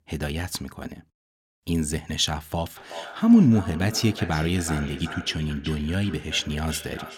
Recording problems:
echo of what is said; noticeable; from 3 s on; 380 ms later, 15 dB below the speech

